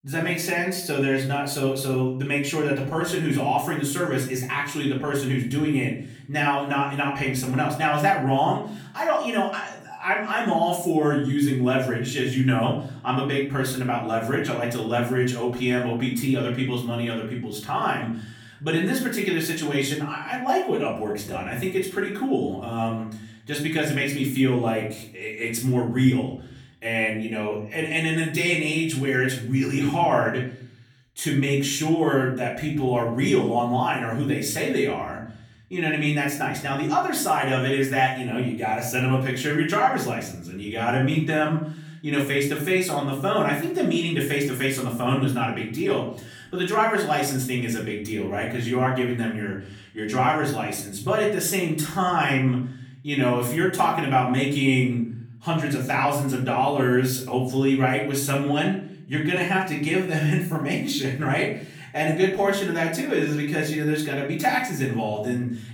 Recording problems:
off-mic speech; far
room echo; slight; dies away in 0.5 s

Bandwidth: 18.5 kHz